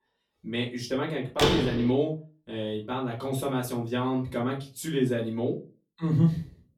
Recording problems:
off-mic speech; far
room echo; very slight; dies away in 0.2 s
door banging; loud; at 1.5 s; peak 4 dB above the speech

